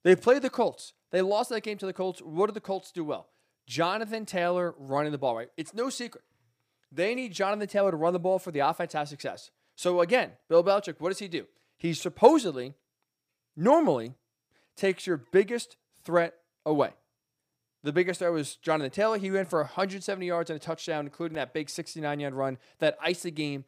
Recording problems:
none

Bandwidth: 15 kHz